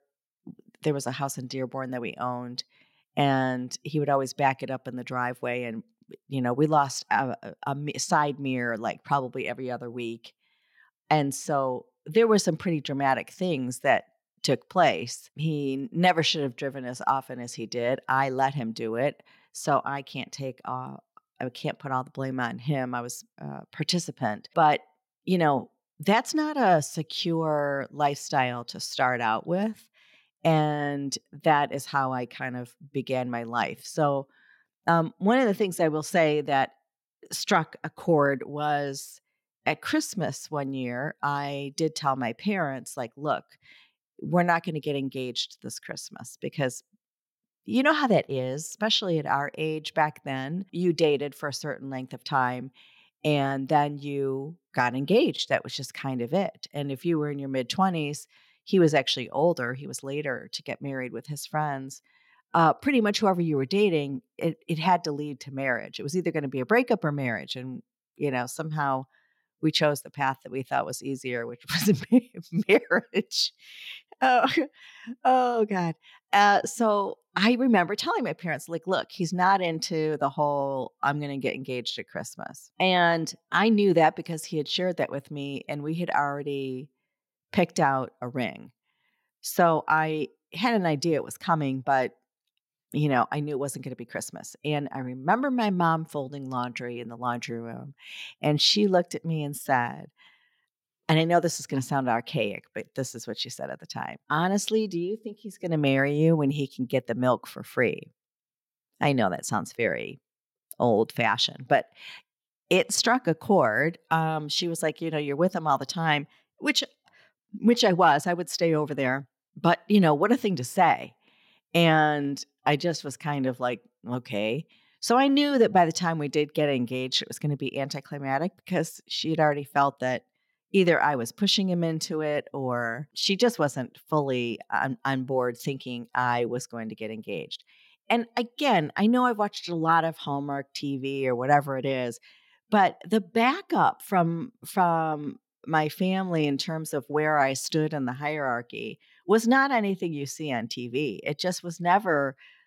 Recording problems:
none

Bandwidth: 16.5 kHz